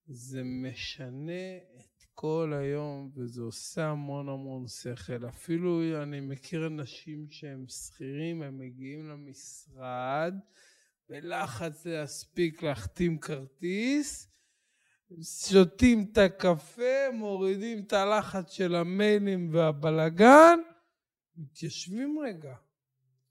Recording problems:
wrong speed, natural pitch; too slow; 0.5 times normal speed

